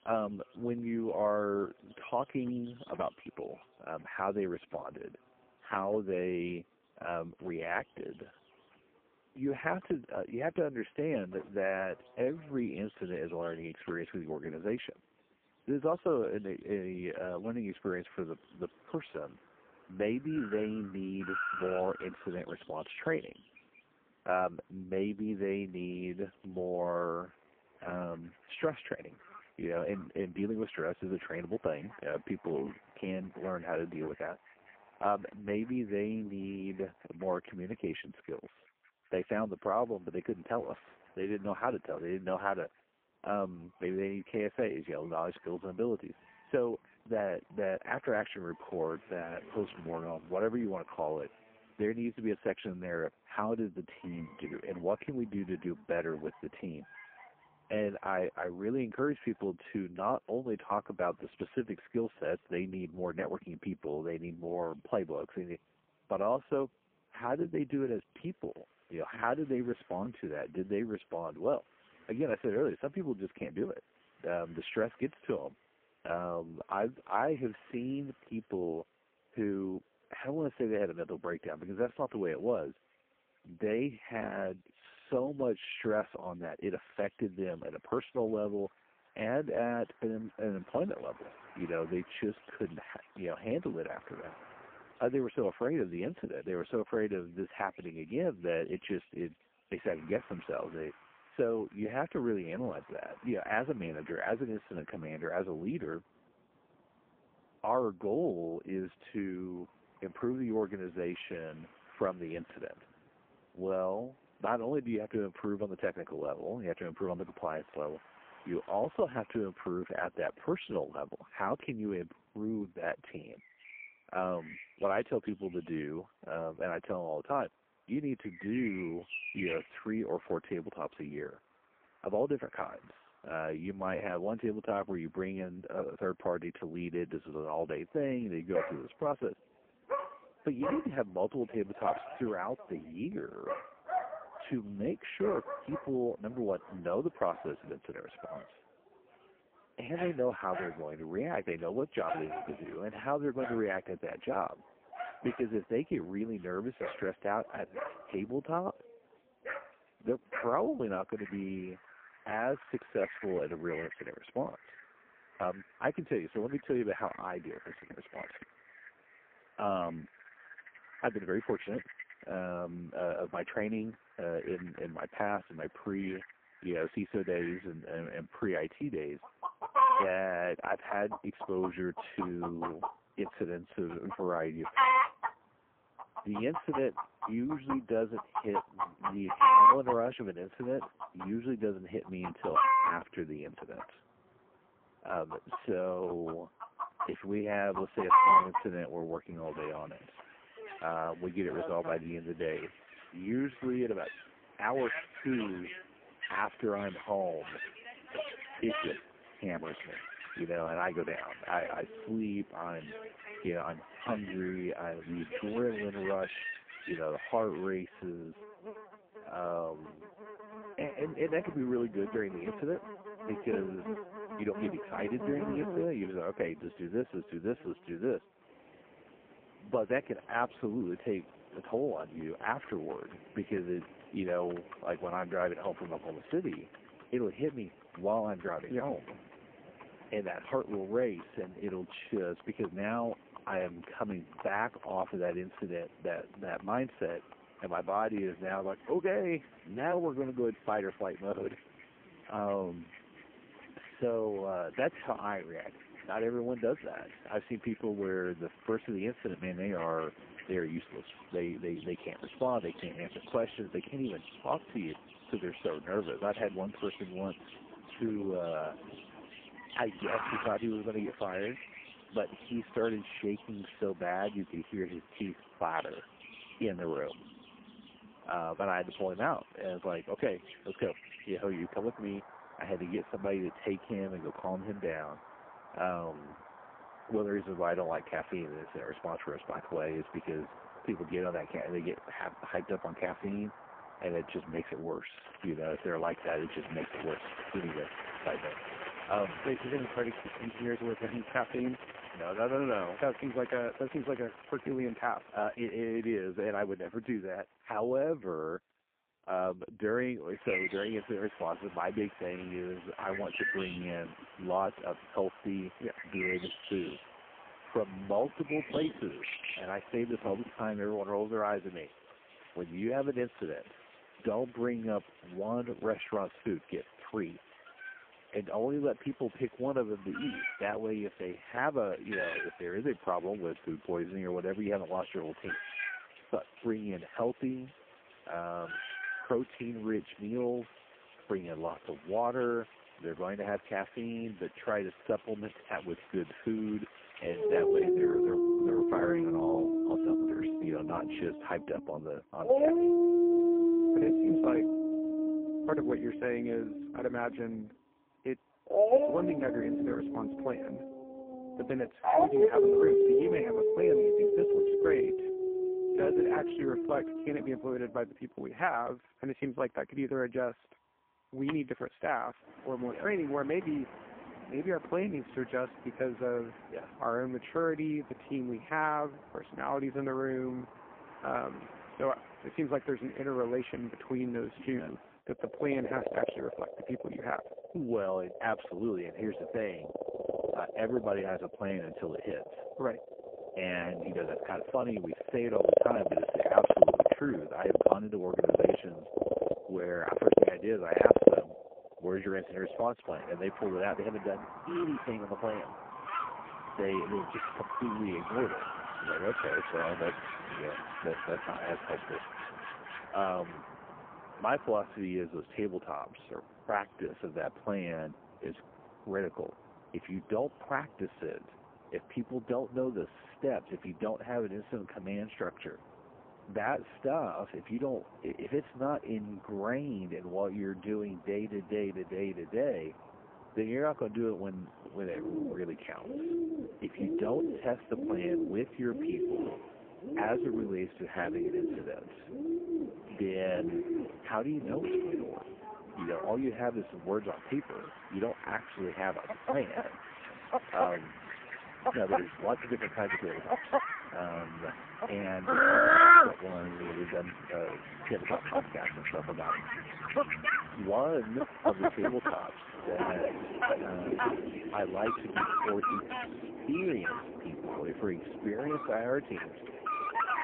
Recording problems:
phone-call audio; poor line
animal sounds; very loud; throughout; 3 dB above the speech
traffic noise; noticeable; throughout; 20 dB below the speech

